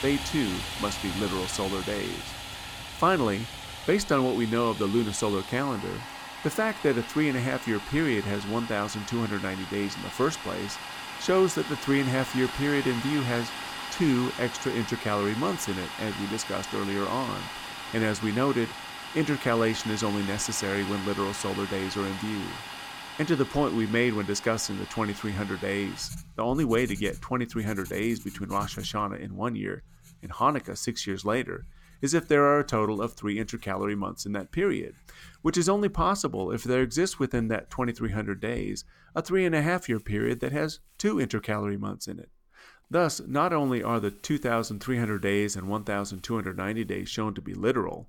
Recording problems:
household noises; loud; throughout; 9 dB below the speech

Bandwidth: 17 kHz